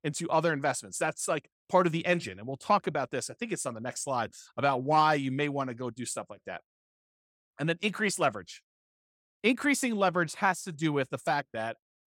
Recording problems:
none

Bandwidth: 17 kHz